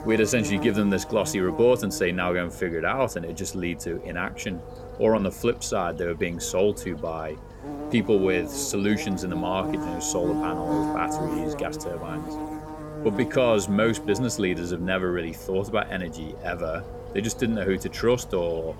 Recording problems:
electrical hum; loud; throughout; 50 Hz, 9 dB below the speech

